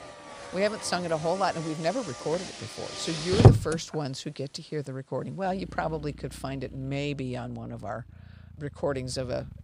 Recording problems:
traffic noise; very loud; throughout; 4 dB above the speech

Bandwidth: 15.5 kHz